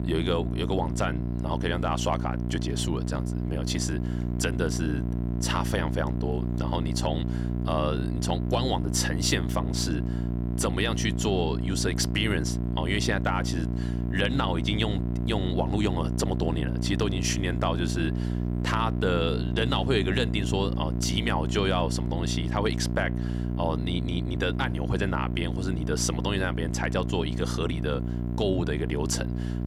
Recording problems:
electrical hum; loud; throughout; 60 Hz, 8 dB below the speech

